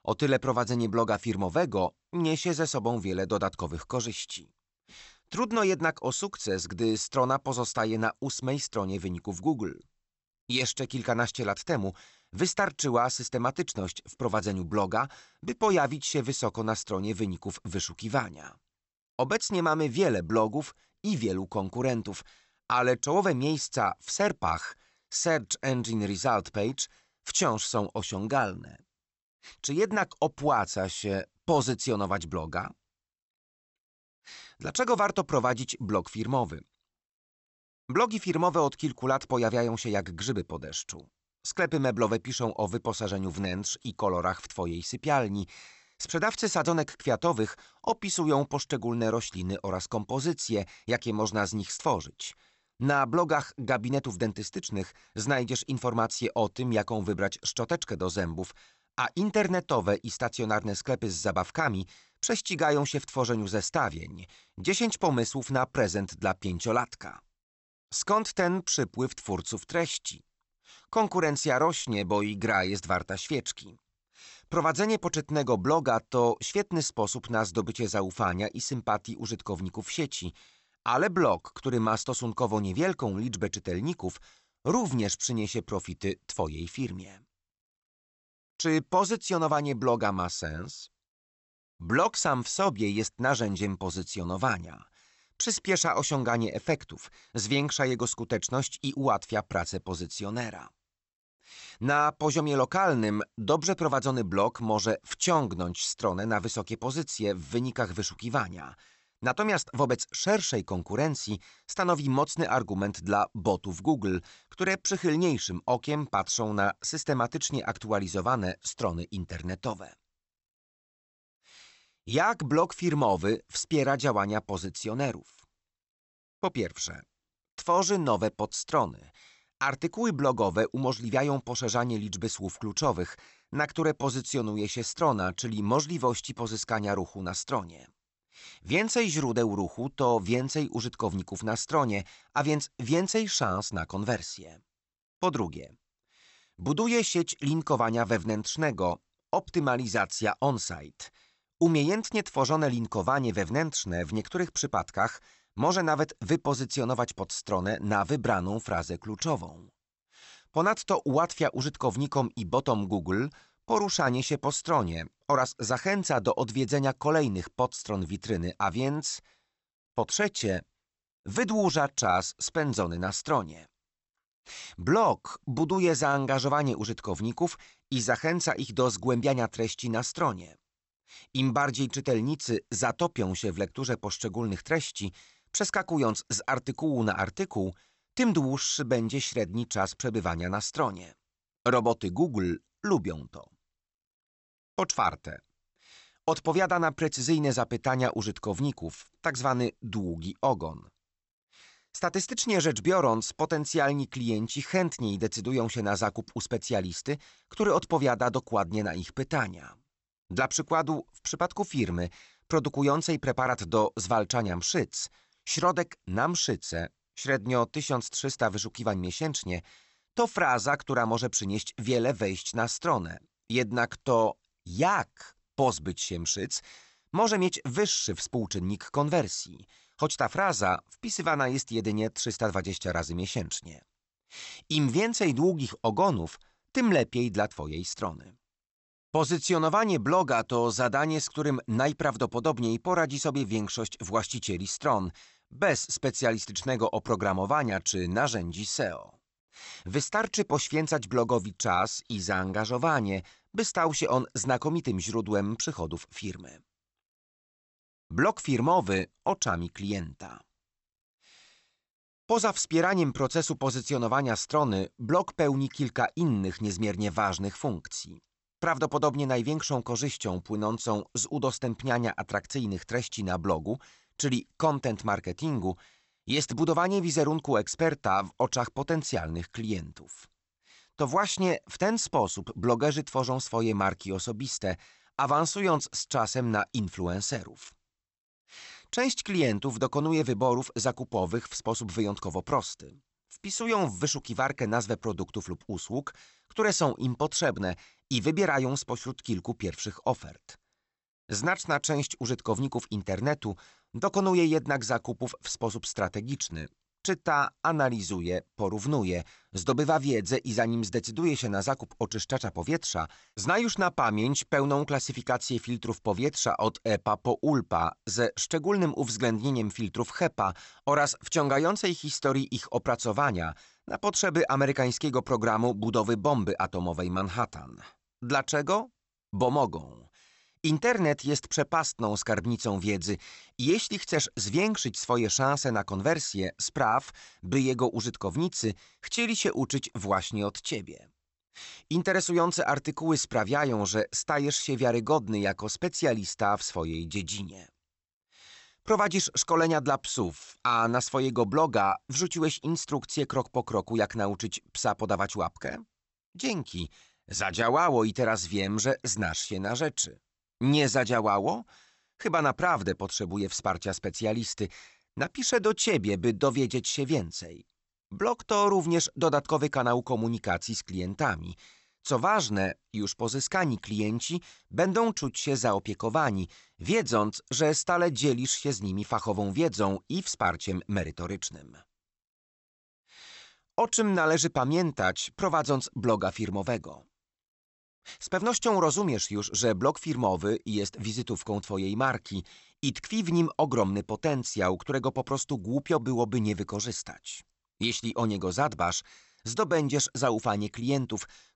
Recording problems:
high frequencies cut off; noticeable; nothing above 8 kHz

